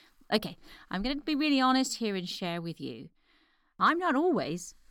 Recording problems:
none

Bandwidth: 17.5 kHz